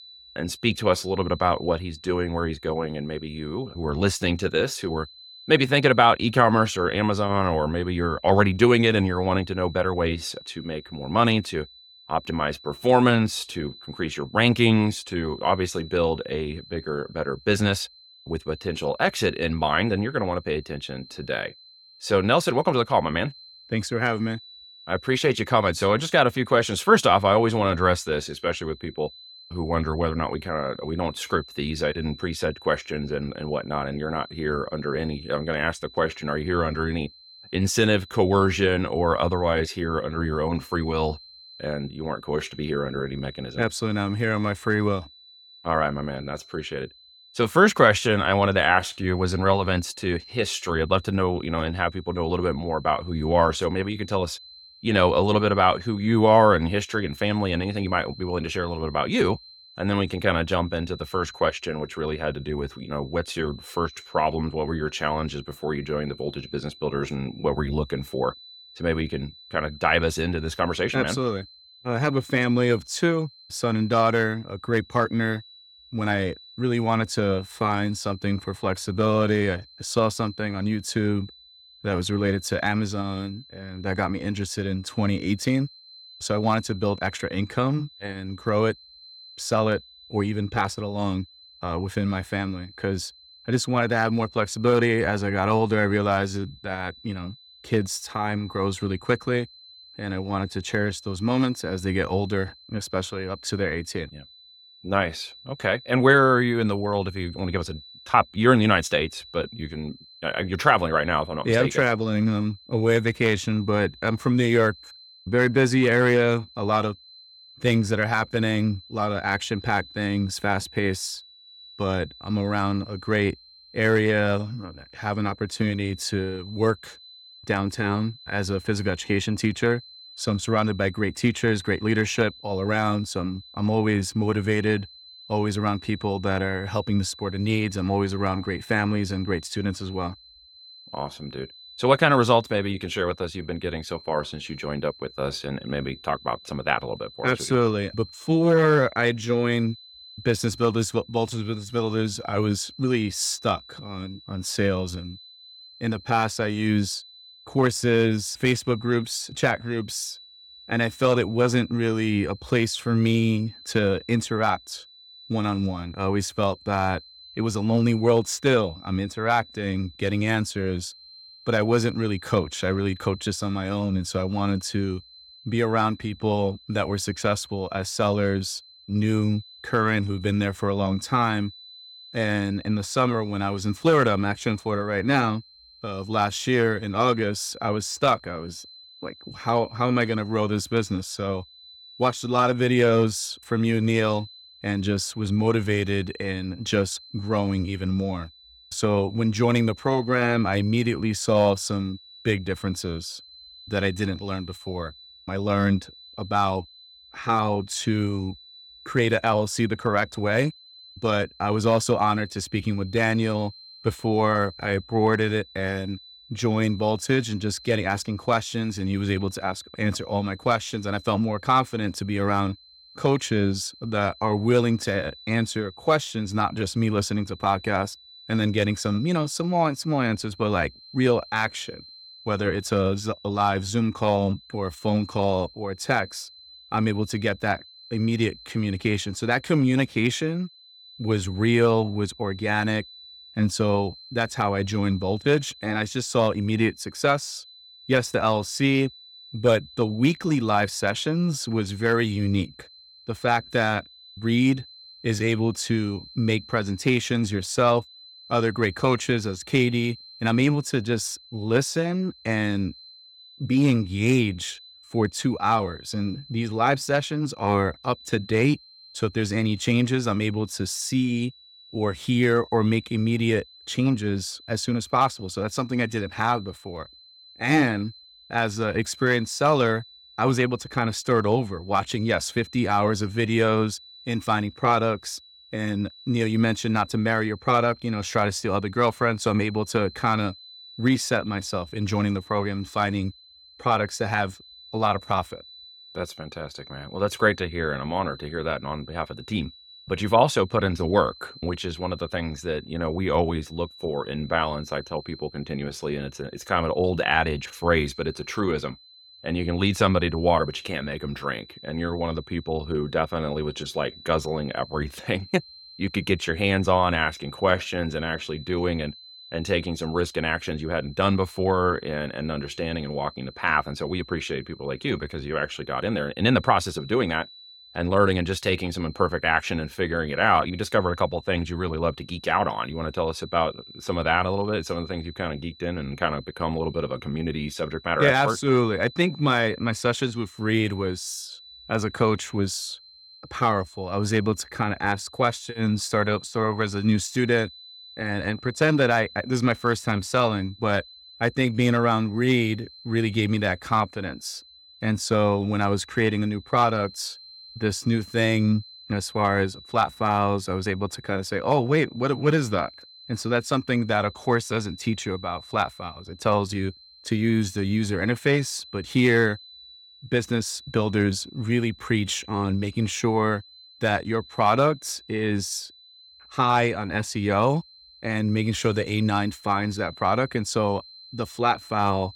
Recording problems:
high-pitched whine; faint; throughout; 4 kHz, 20 dB below the speech

